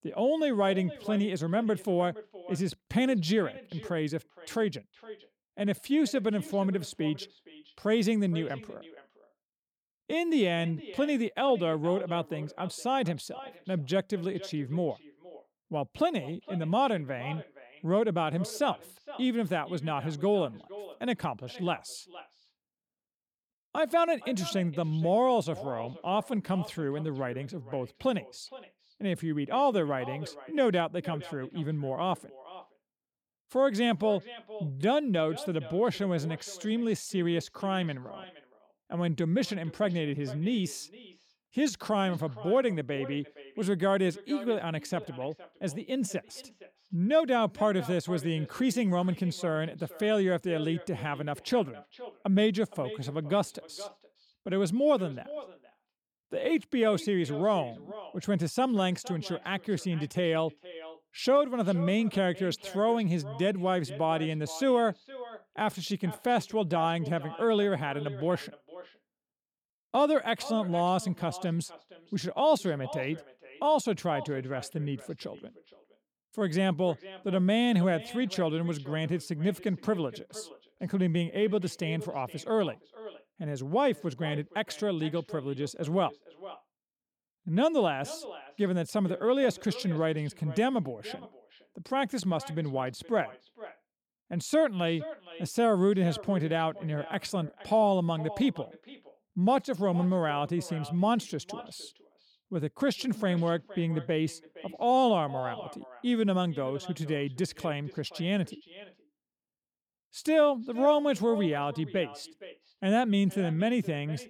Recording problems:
echo of what is said; noticeable; throughout; 470 ms later, 20 dB below the speech

